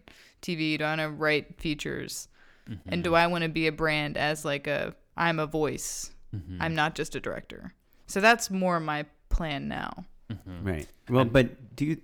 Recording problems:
none

